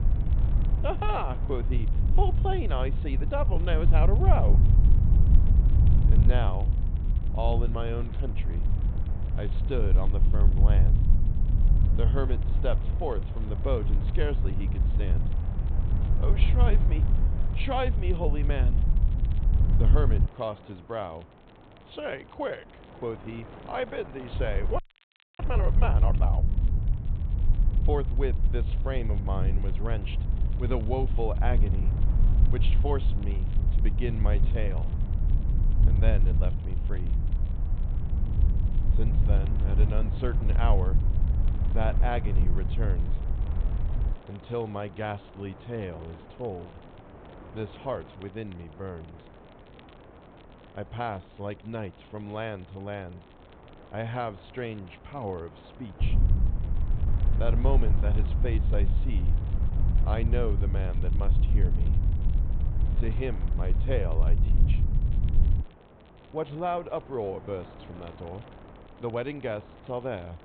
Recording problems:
high frequencies cut off; severe; nothing above 4 kHz
low rumble; loud; until 20 s, from 24 to 44 s and from 56 s to 1:06; 9 dB below the speech
wind noise on the microphone; occasional gusts; 15 dB below the speech
crackle, like an old record; faint; 25 dB below the speech
audio freezing; at 25 s for 0.5 s

